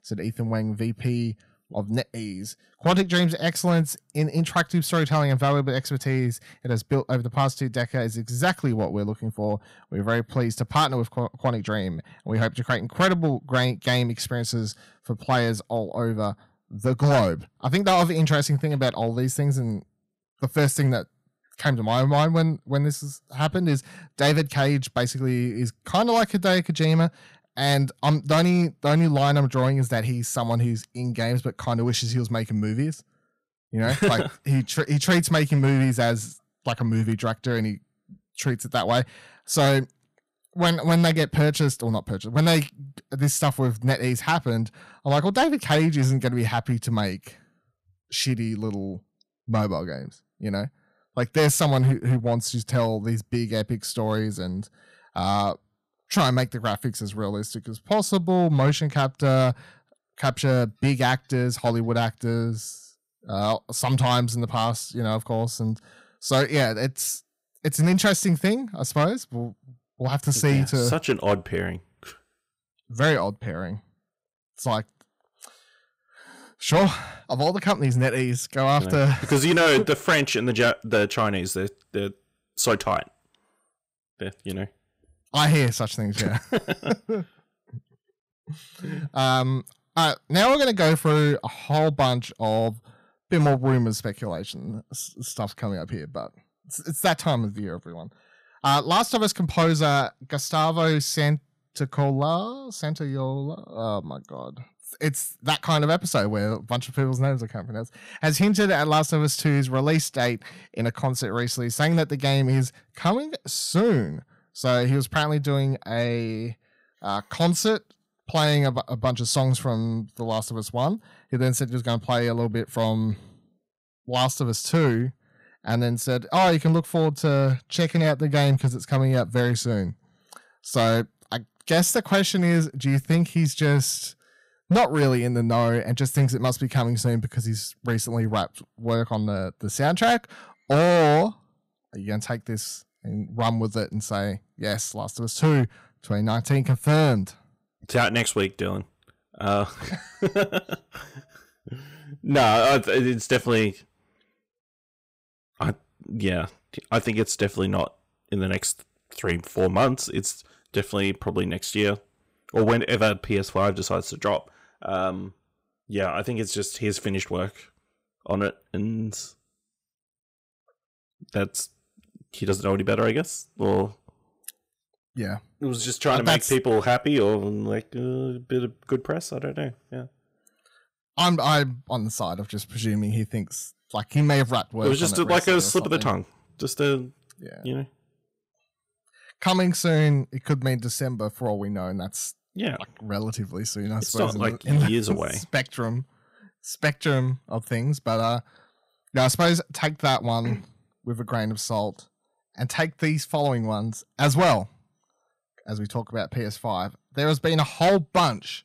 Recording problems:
distortion; slight; 3% of the sound clipped

